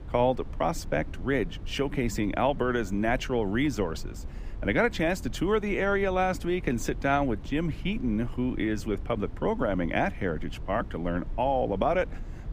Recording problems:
low rumble; faint; throughout; 25 dB below the speech

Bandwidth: 15 kHz